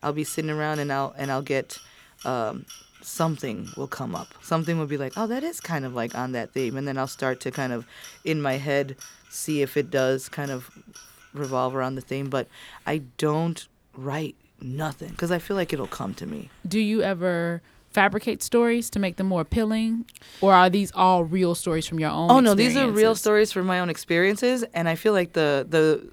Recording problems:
household noises; faint; throughout; 25 dB below the speech

